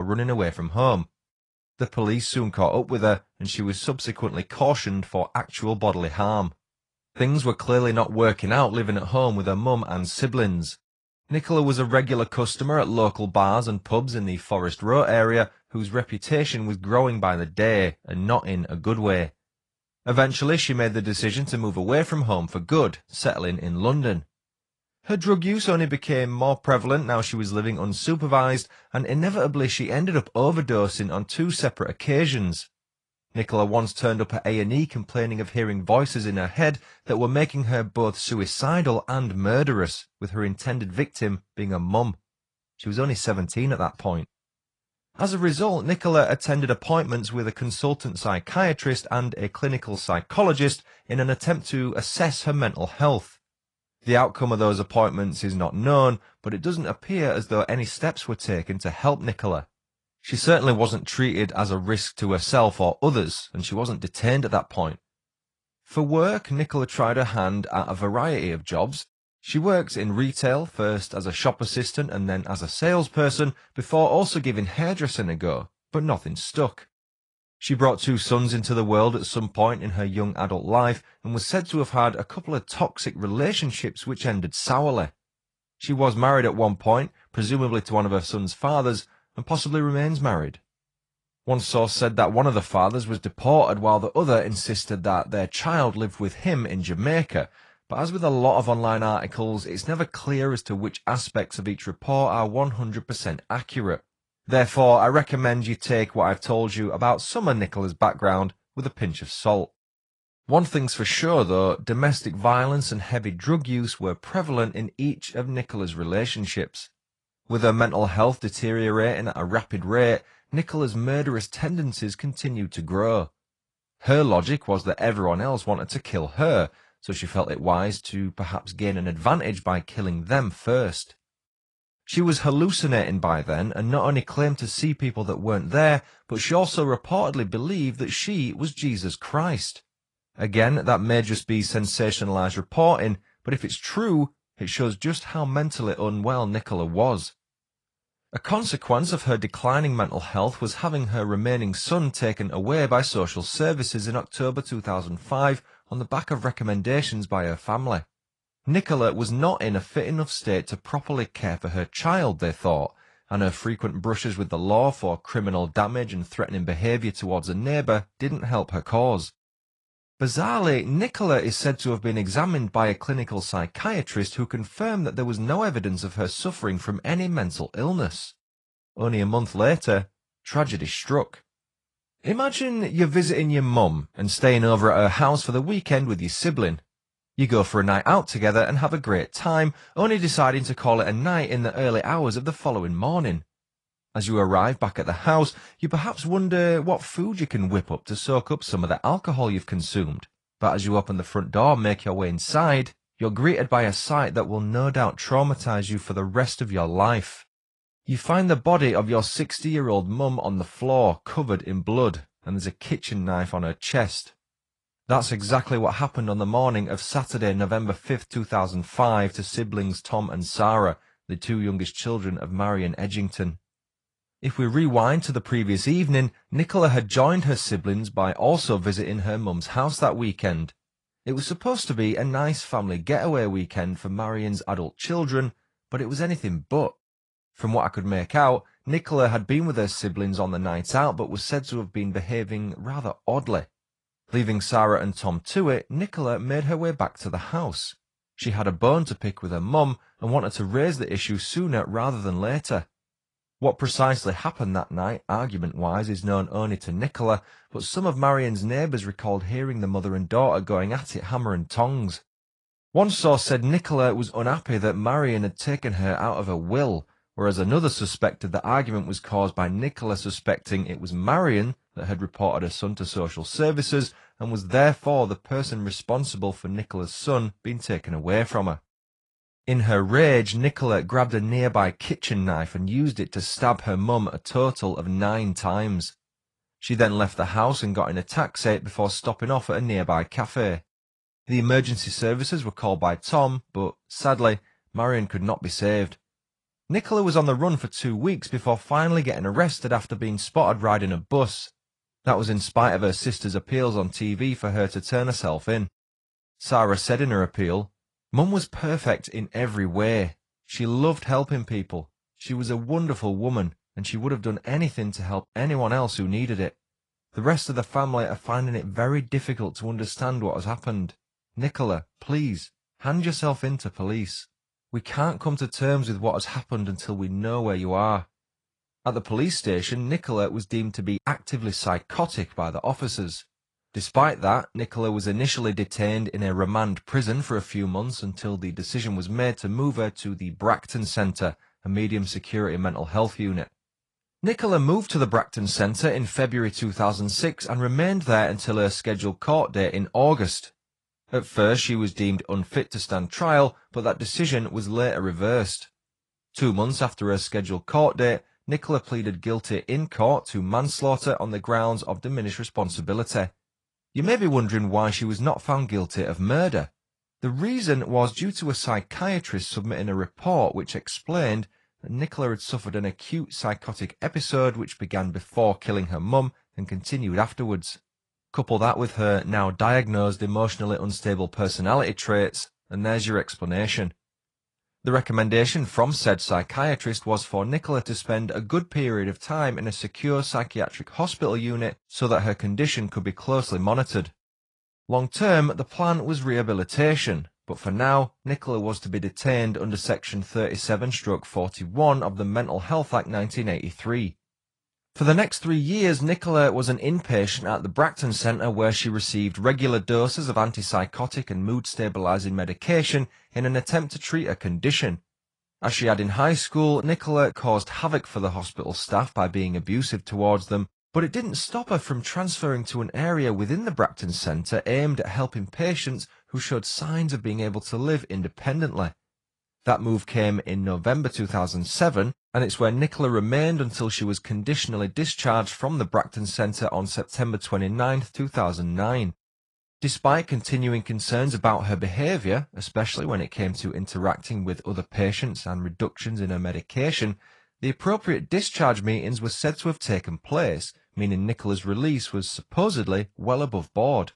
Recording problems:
garbled, watery; slightly; nothing above 10 kHz
abrupt cut into speech; at the start

